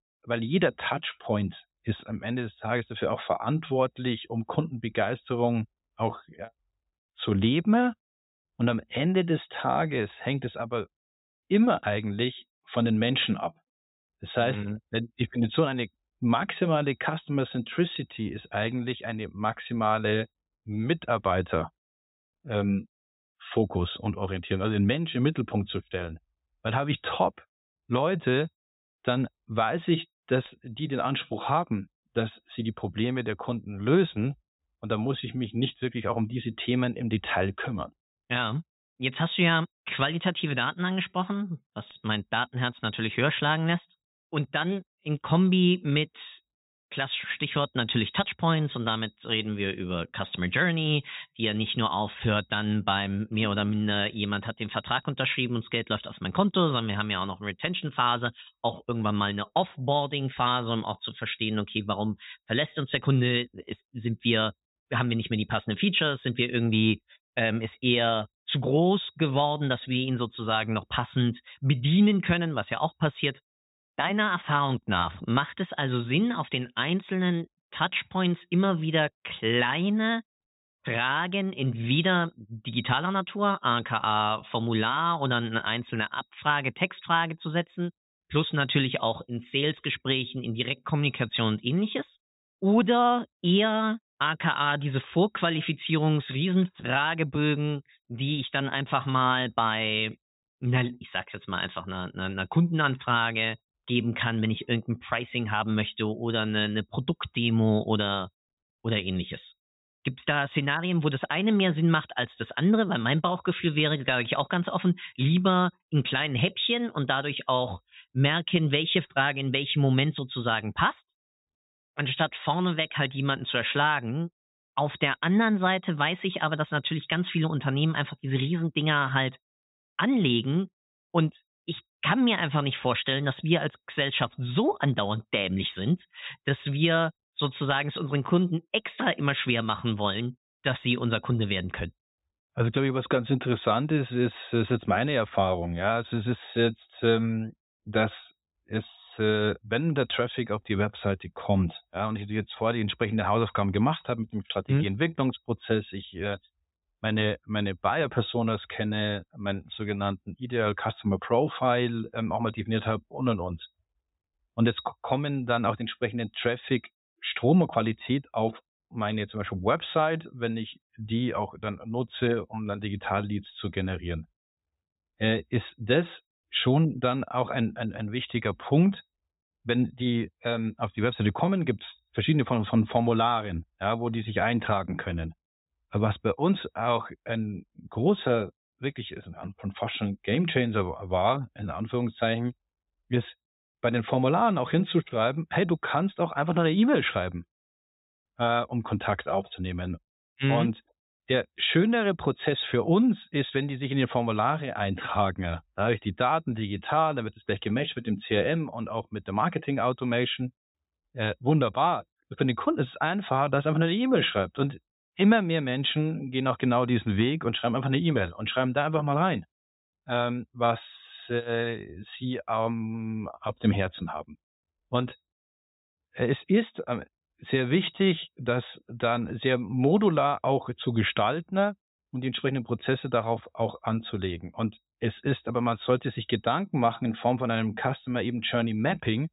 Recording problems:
high frequencies cut off; severe; nothing above 4 kHz

